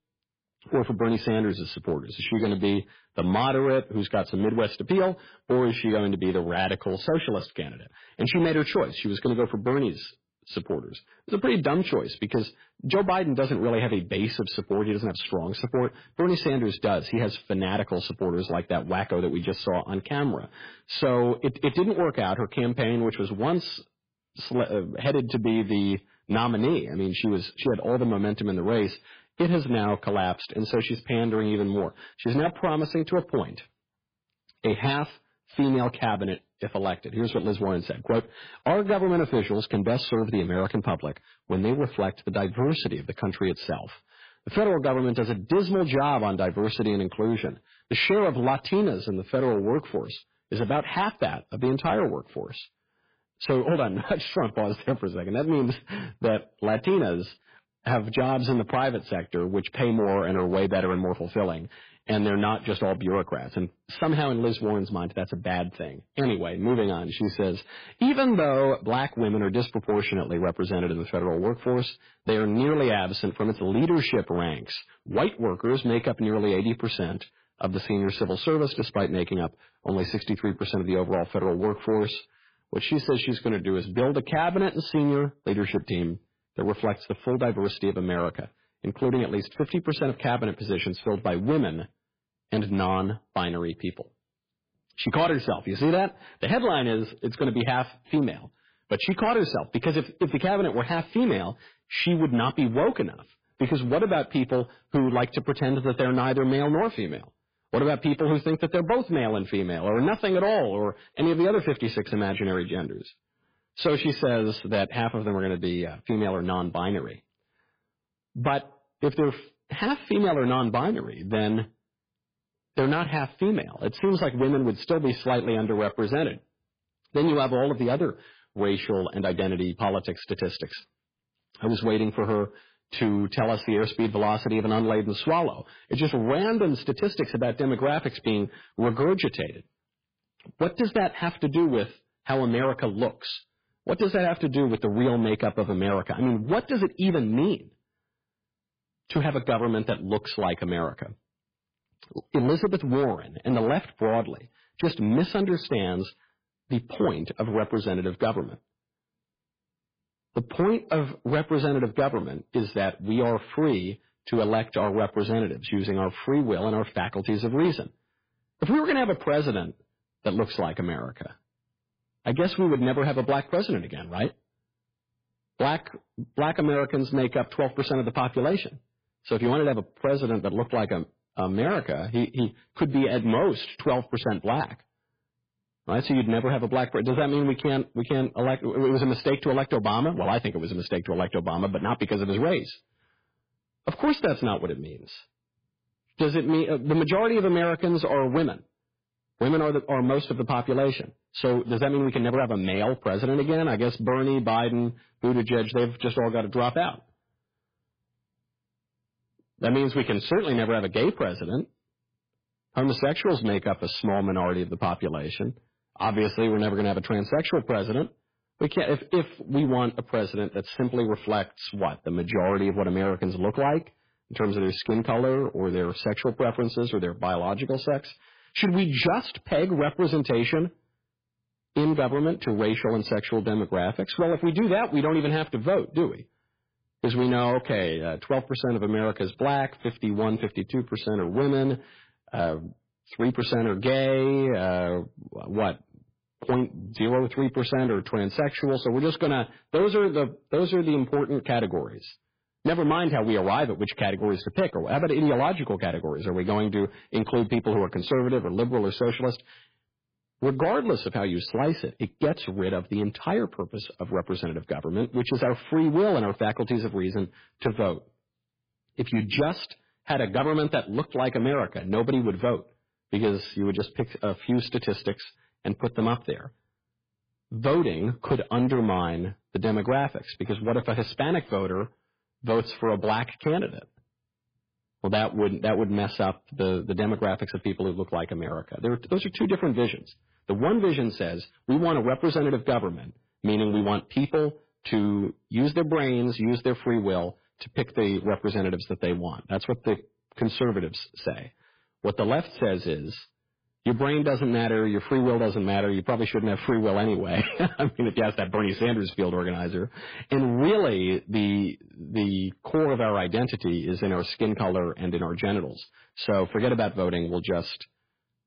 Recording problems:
garbled, watery; badly; nothing above 5 kHz
distortion; slight; 6% of the sound clipped

